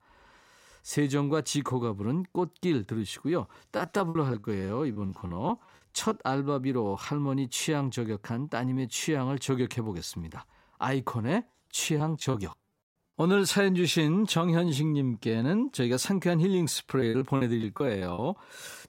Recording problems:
choppy; very; from 4 to 6 s, at 12 s and from 17 to 18 s; 16% of the speech affected

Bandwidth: 16 kHz